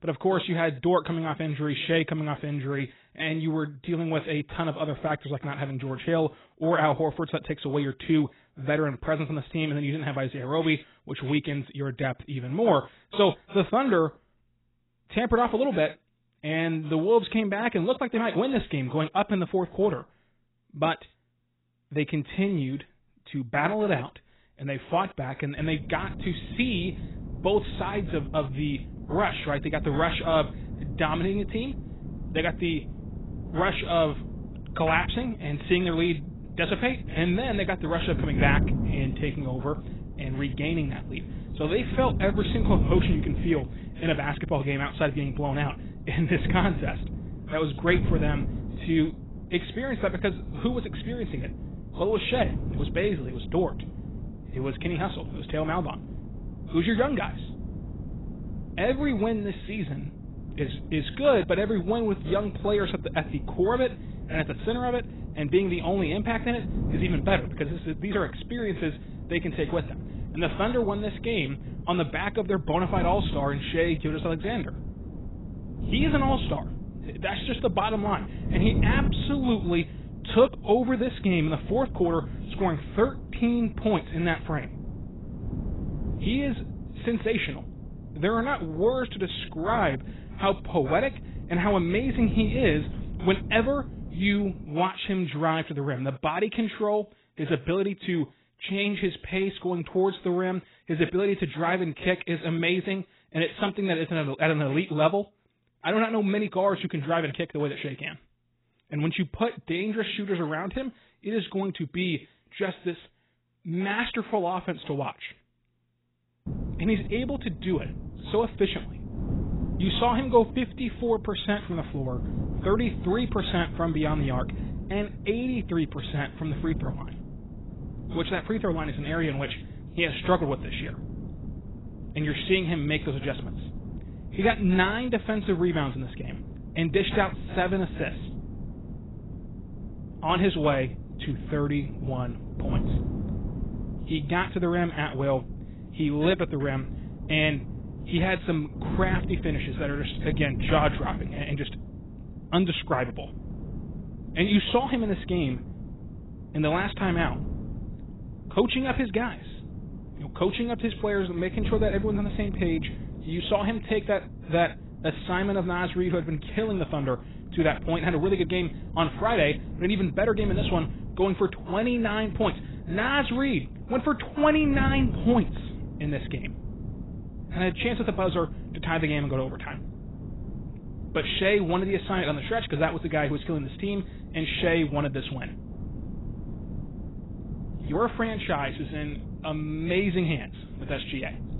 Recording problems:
garbled, watery; badly; nothing above 4 kHz
wind noise on the microphone; occasional gusts; from 26 s to 1:35 and from 1:56 on; 15 dB below the speech

